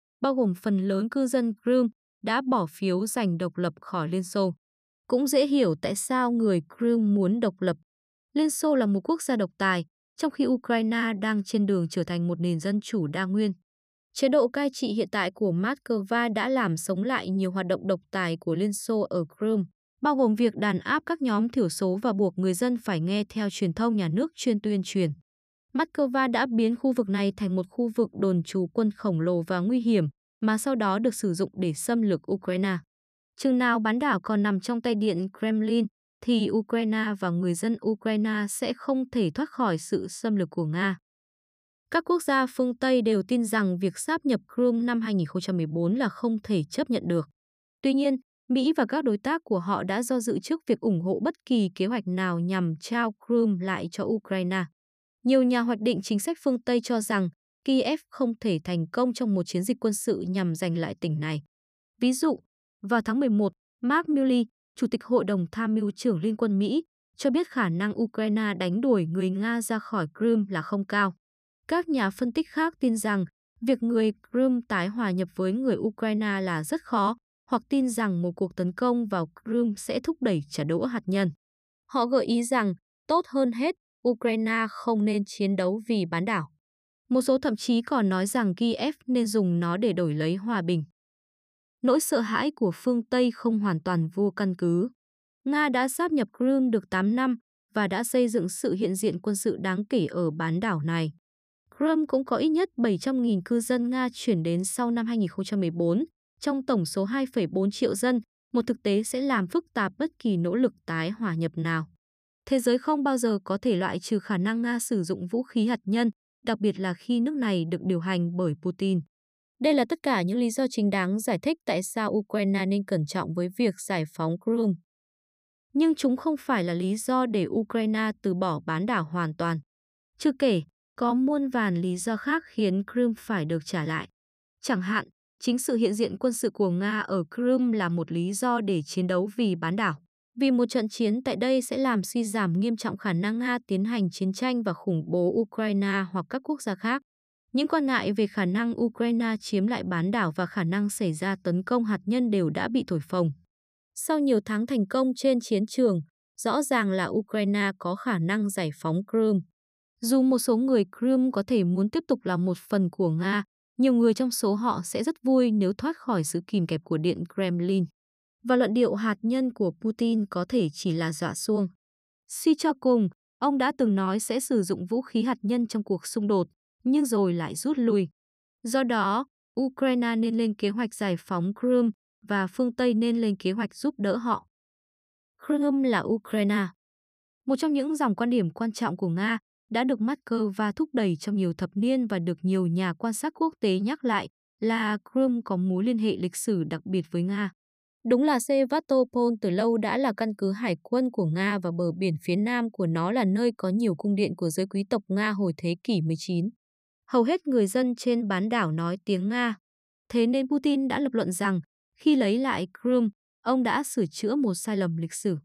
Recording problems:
none

